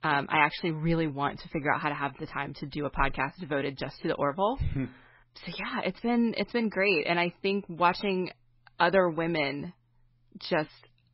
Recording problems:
garbled, watery; badly; nothing above 5.5 kHz

